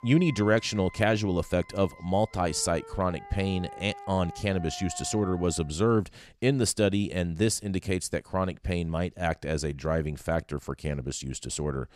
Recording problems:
background music; noticeable; until 5.5 s; 15 dB below the speech

